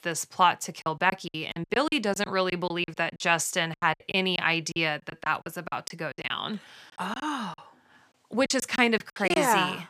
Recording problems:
choppy; very; 14% of the speech affected

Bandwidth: 15 kHz